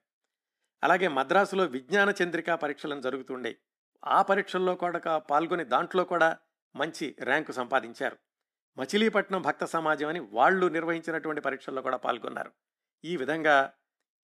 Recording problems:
none

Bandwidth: 14.5 kHz